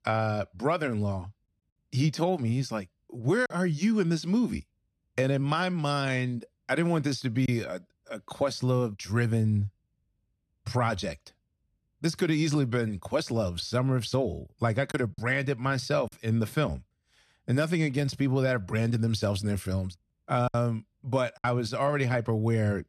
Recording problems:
choppy; occasionally; 2% of the speech affected

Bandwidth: 13.5 kHz